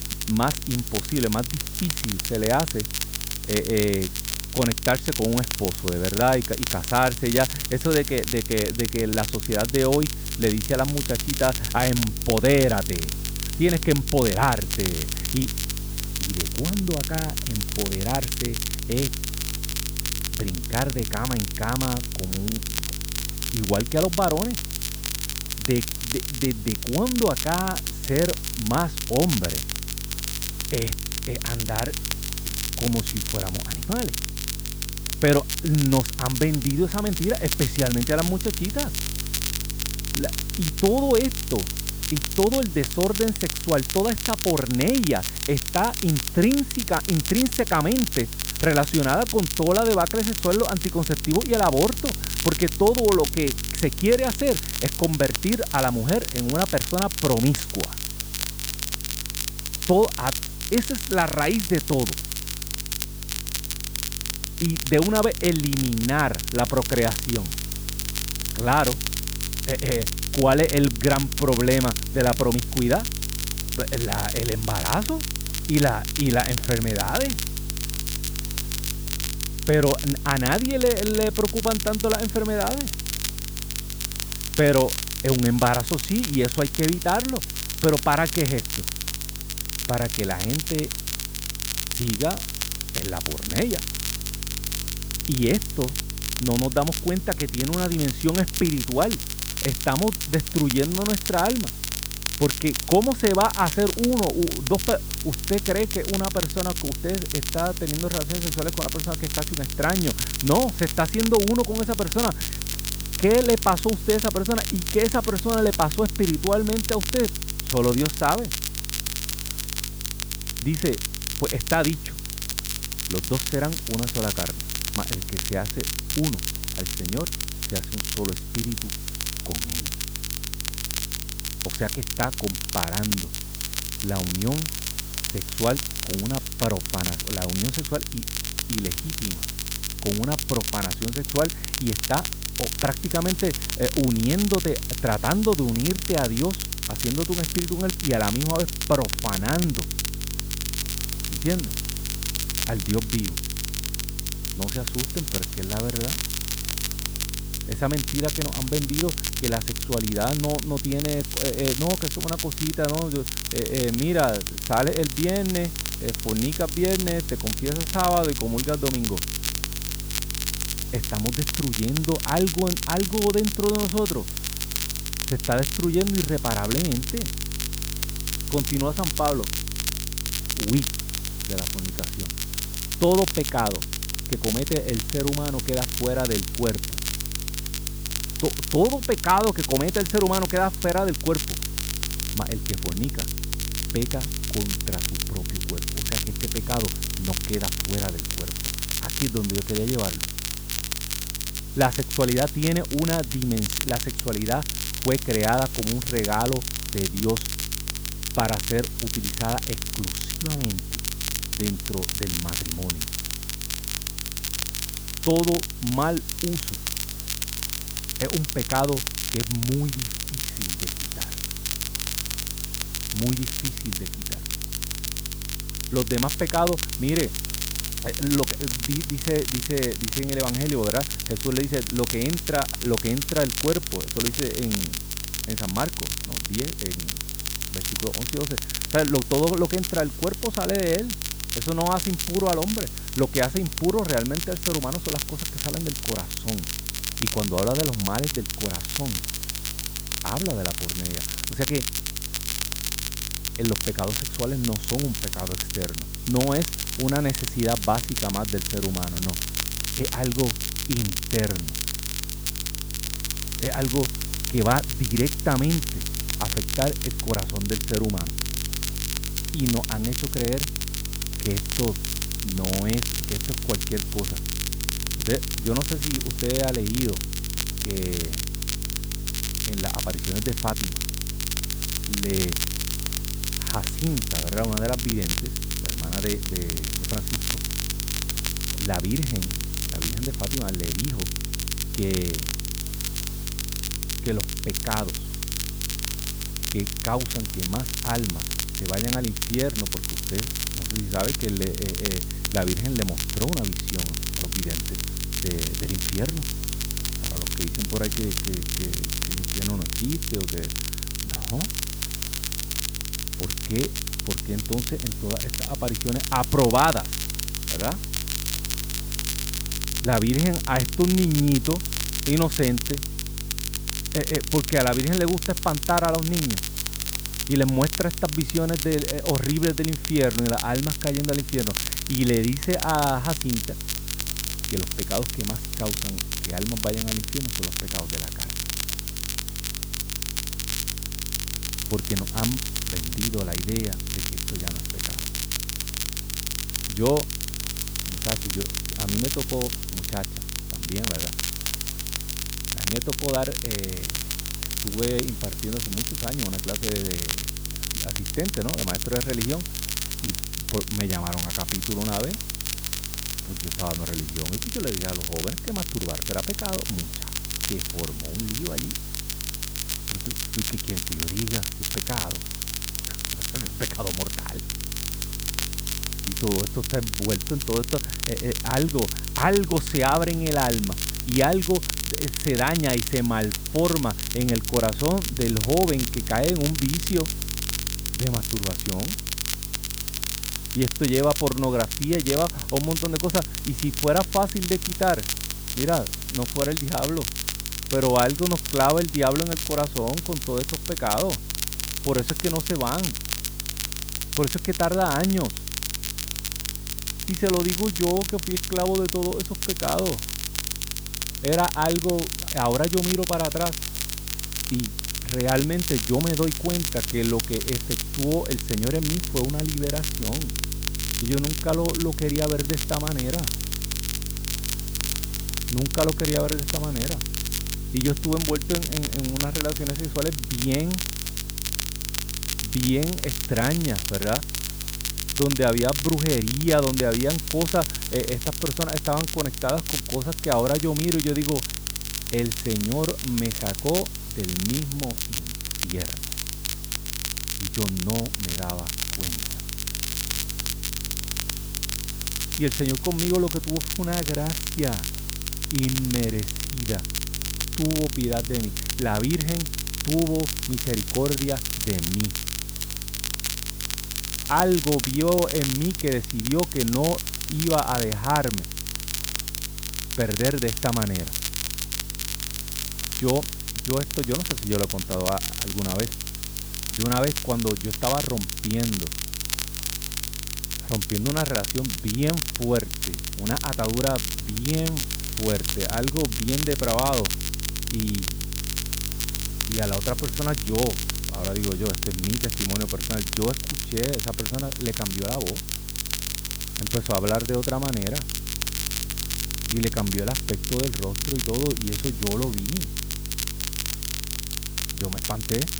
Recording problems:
muffled; slightly; fading above 2.5 kHz
crackle, like an old record; loud; 3 dB below the speech
hiss; noticeable; throughout; 10 dB below the speech
electrical hum; faint; throughout; 50 Hz, 20 dB below the speech

